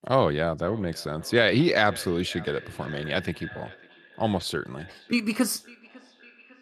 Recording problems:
echo of what is said; faint; throughout; 550 ms later, 20 dB below the speech

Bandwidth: 13.5 kHz